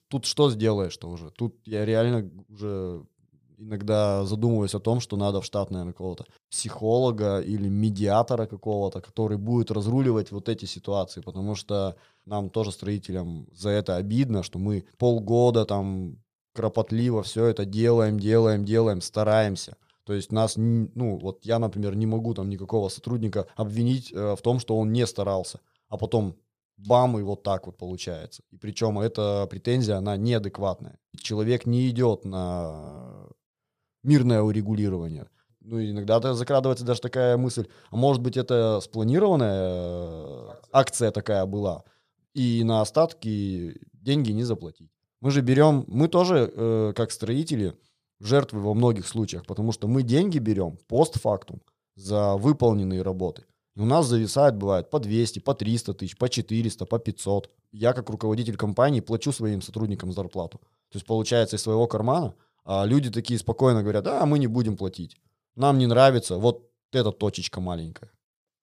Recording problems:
none

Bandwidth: 15 kHz